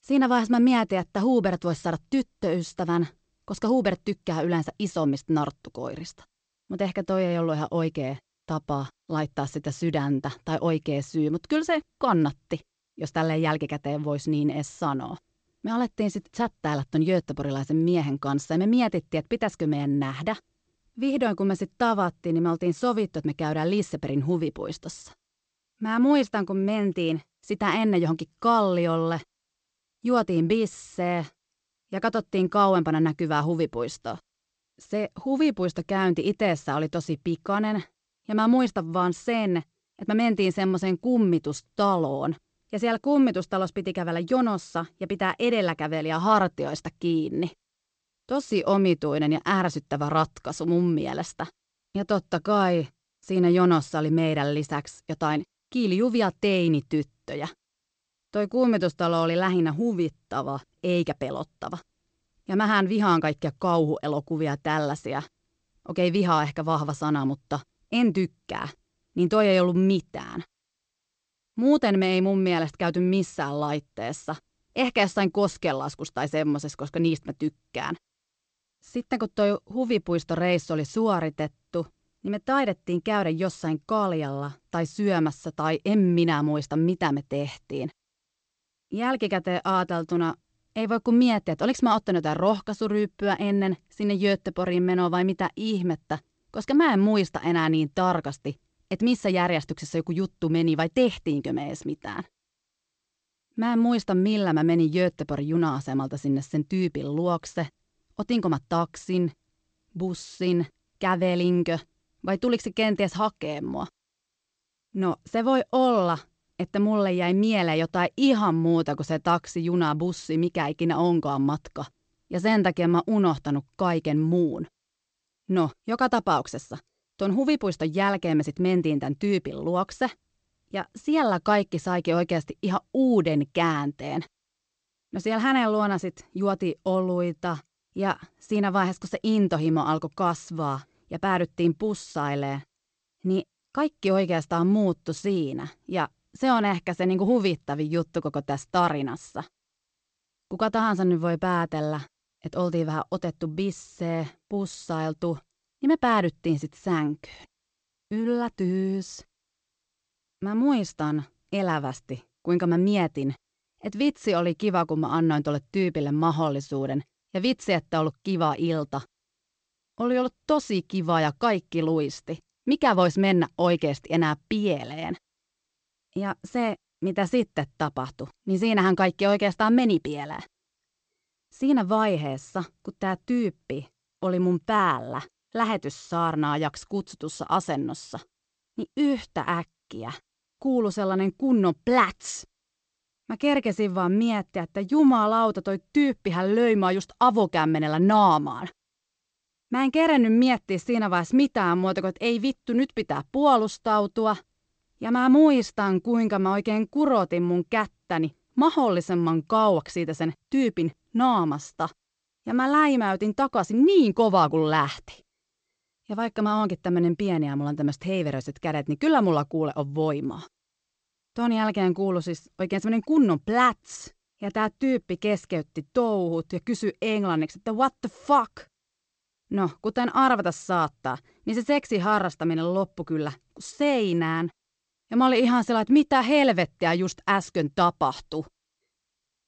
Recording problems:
garbled, watery; slightly; nothing above 8 kHz

